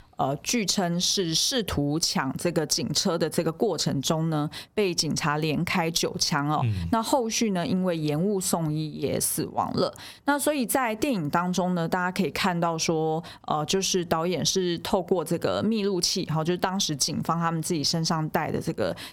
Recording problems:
squashed, flat; somewhat

